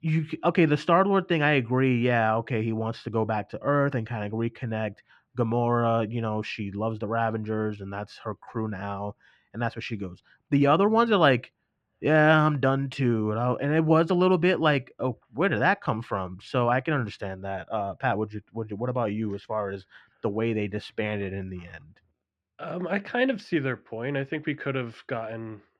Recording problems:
muffled; slightly; fading above 2.5 kHz

